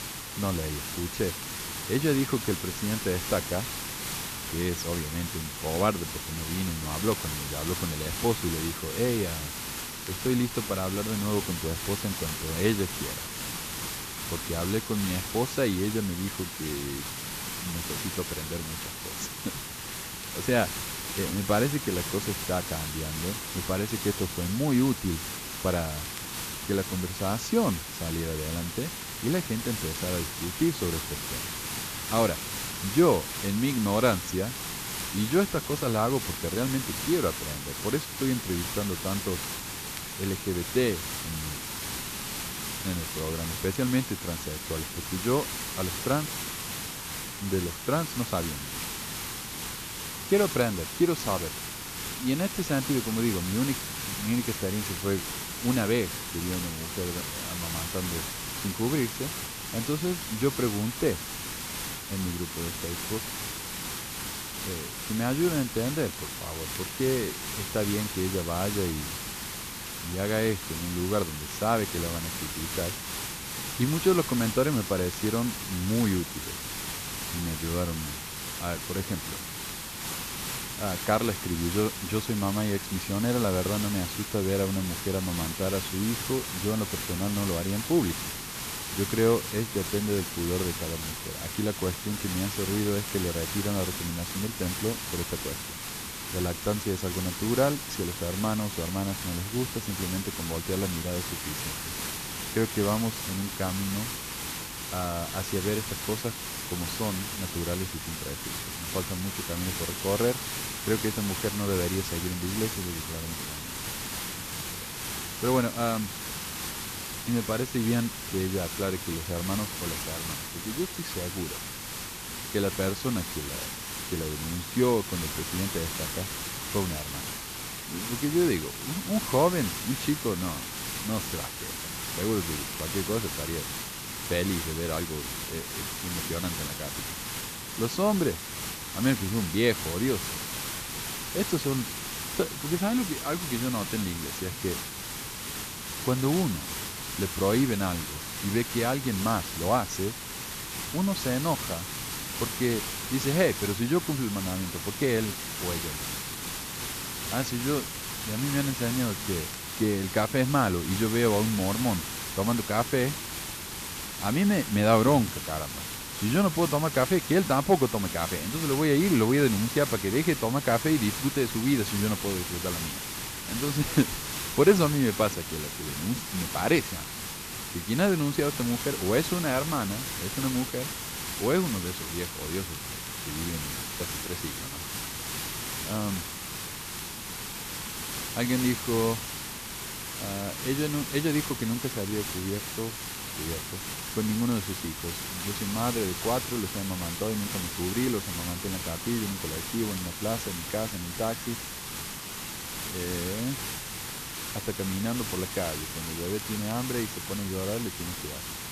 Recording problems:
high frequencies cut off; slight; nothing above 8 kHz
hiss; loud; throughout; 4 dB below the speech
crackle, like an old record; faint; 25 dB below the speech

